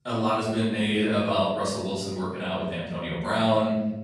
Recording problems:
off-mic speech; far
room echo; noticeable; dies away in 1 s

